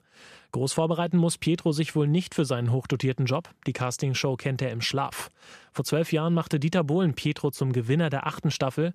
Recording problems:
none

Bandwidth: 14.5 kHz